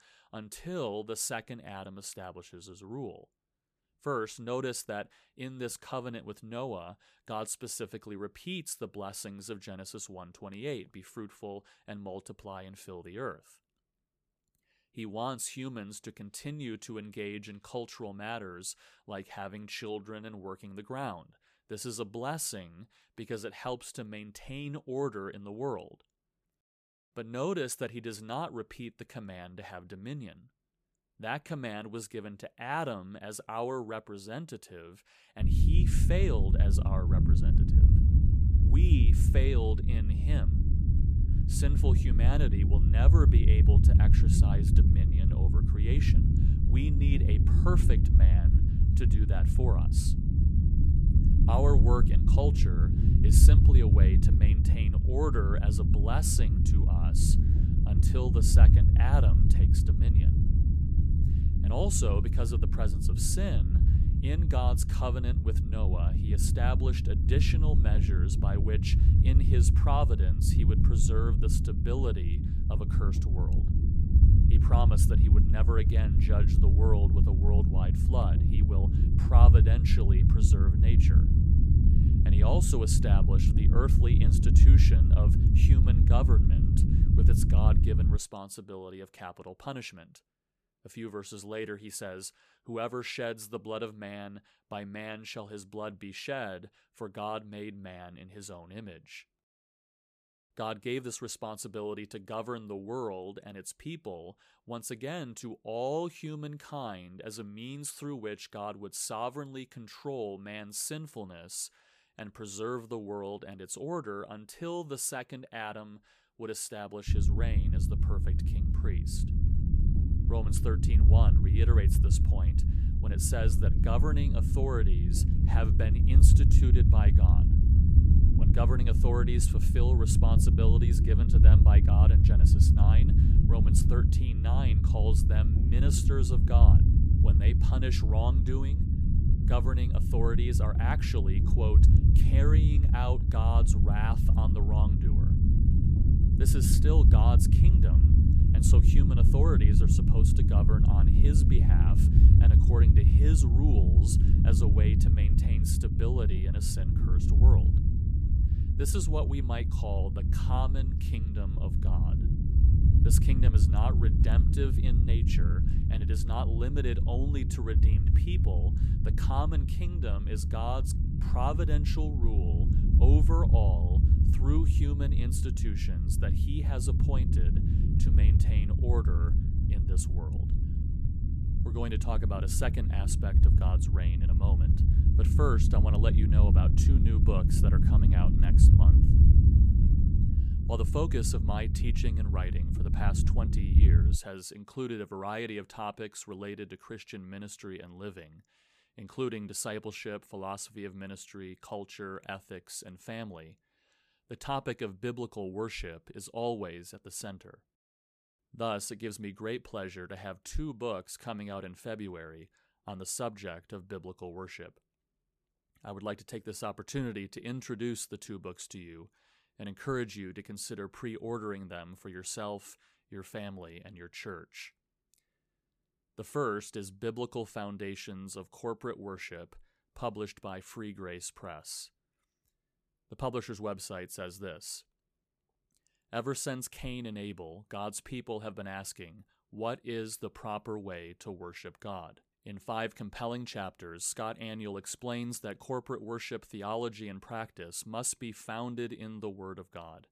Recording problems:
low rumble; loud; from 35 s to 1:28 and from 1:57 to 3:14; 1 dB below the speech

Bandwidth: 14.5 kHz